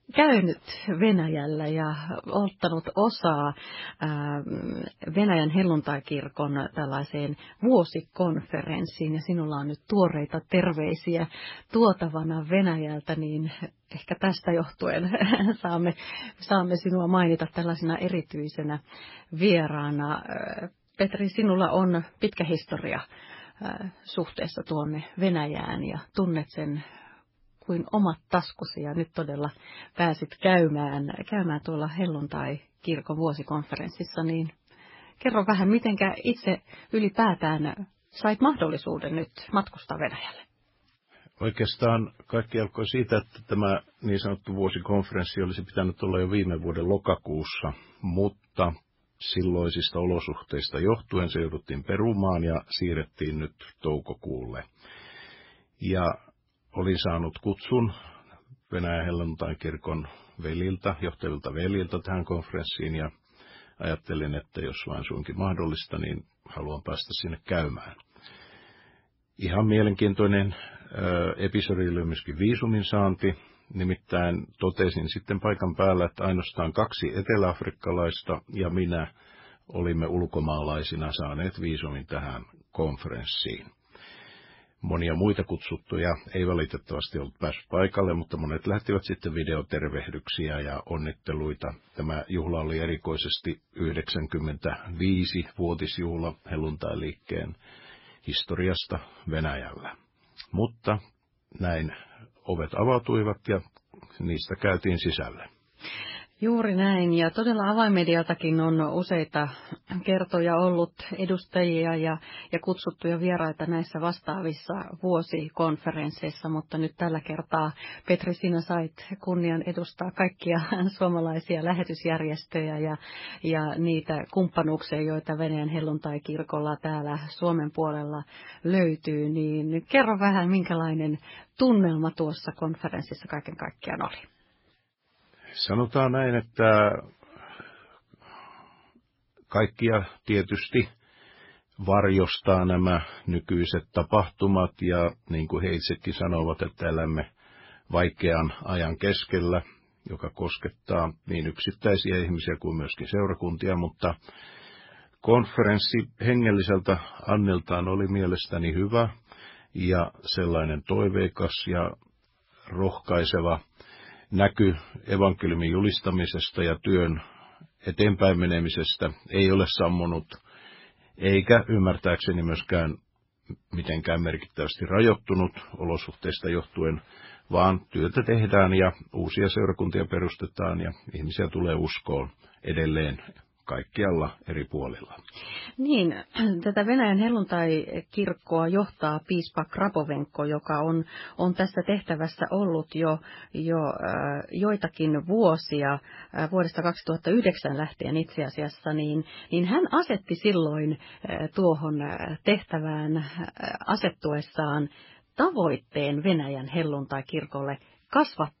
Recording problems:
garbled, watery; badly; nothing above 5.5 kHz

